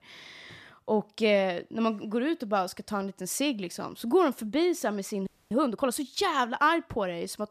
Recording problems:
audio freezing; at 5.5 s

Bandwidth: 14.5 kHz